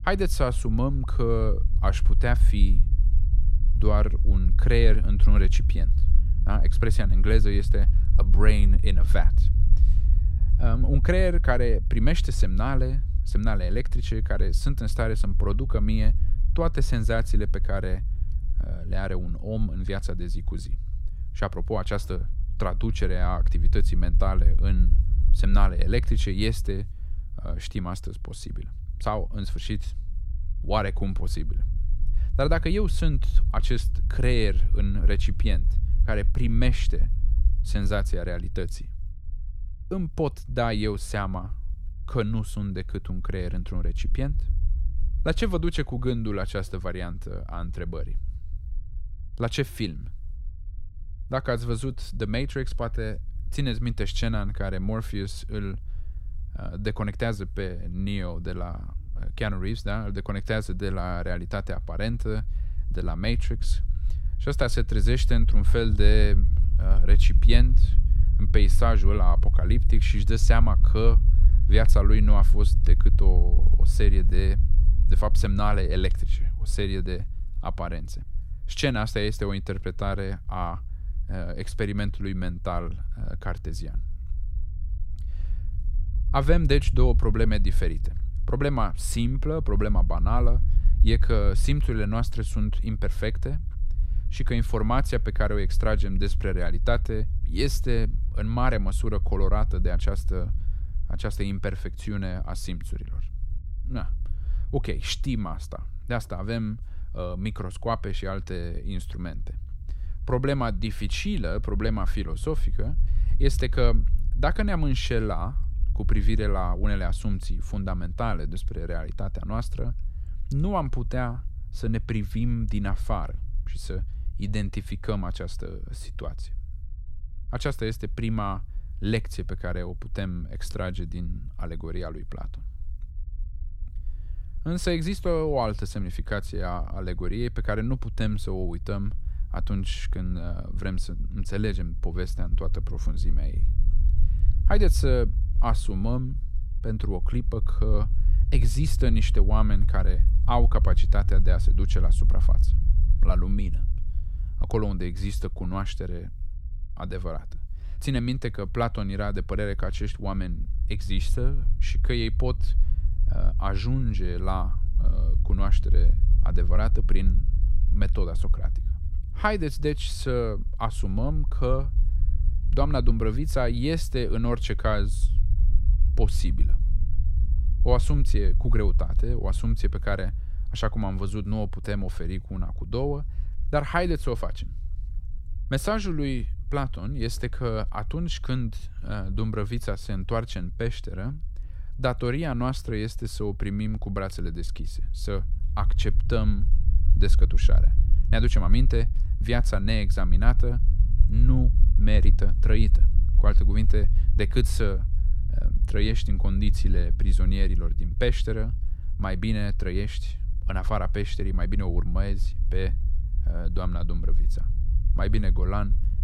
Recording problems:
low rumble; noticeable; throughout; 15 dB below the speech

